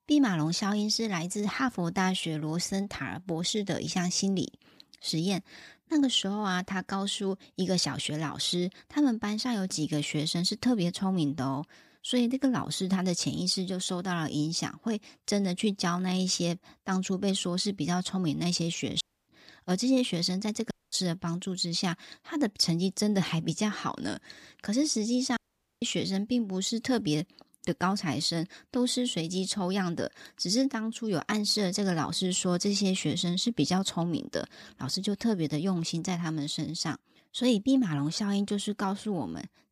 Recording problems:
audio cutting out; at 19 s, at 21 s and at 25 s

